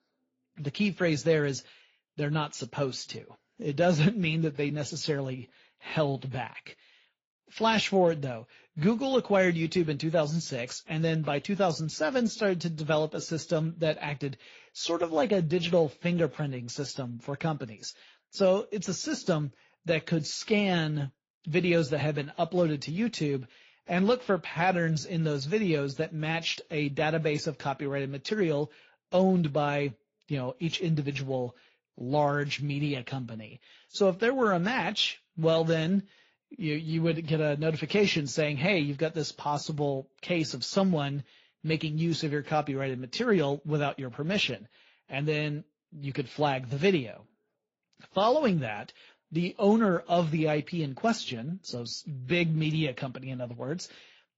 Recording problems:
garbled, watery; slightly; nothing above 7.5 kHz

